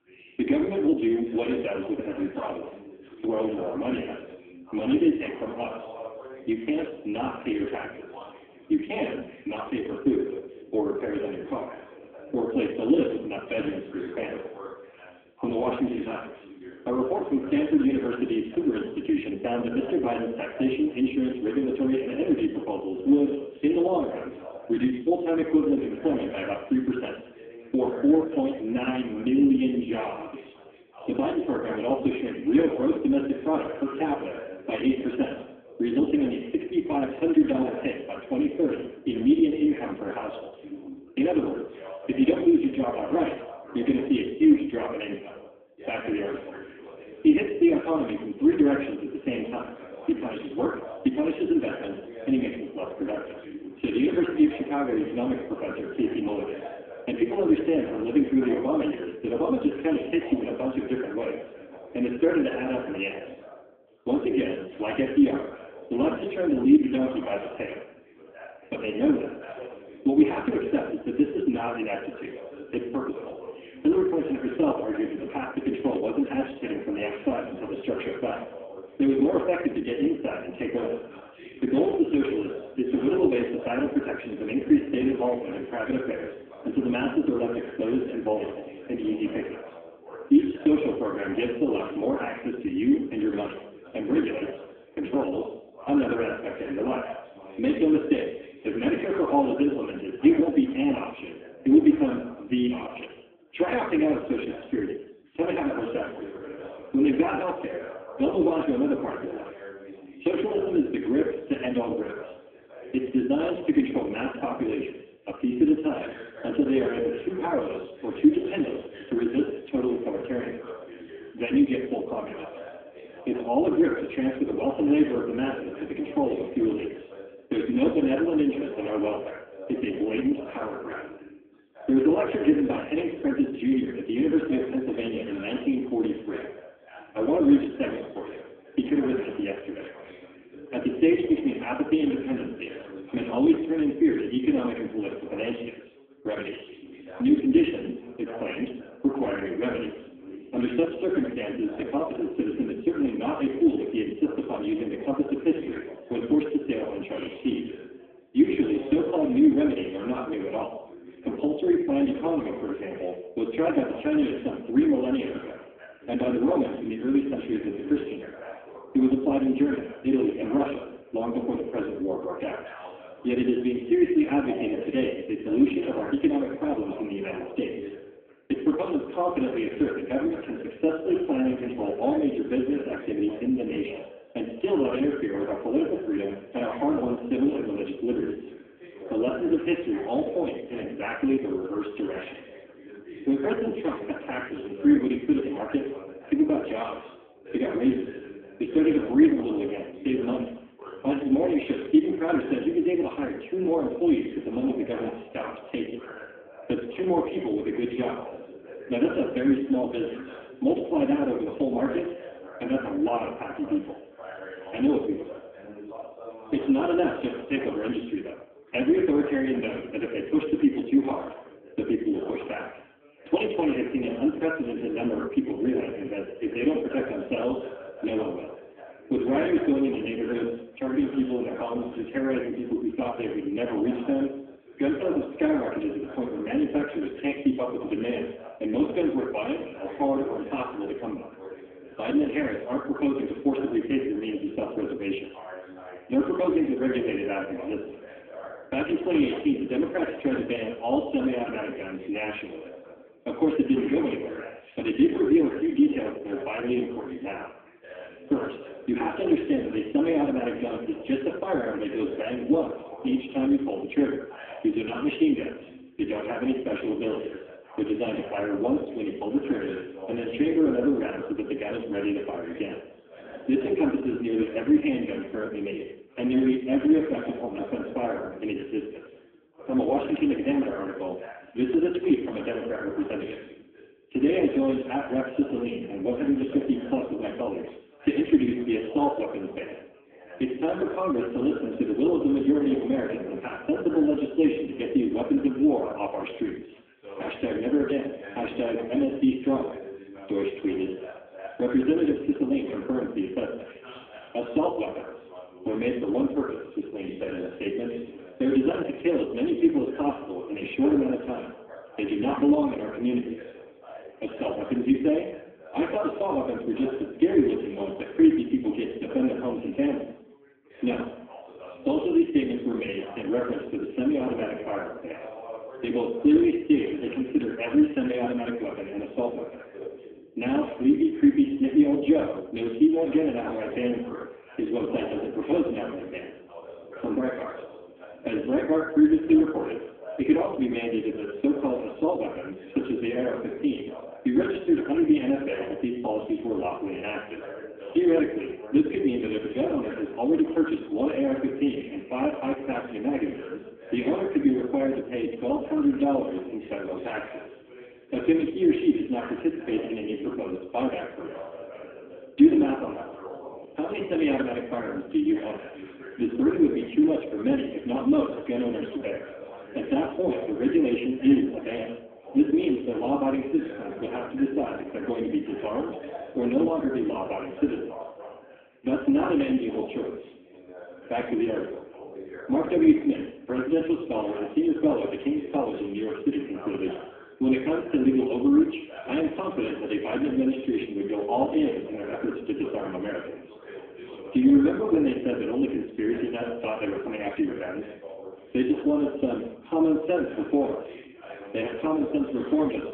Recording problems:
phone-call audio; poor line; nothing above 8 kHz
off-mic speech; far
room echo; noticeable; dies away in 0.7 s
background chatter; noticeable; throughout; 2 voices, 15 dB below the speech

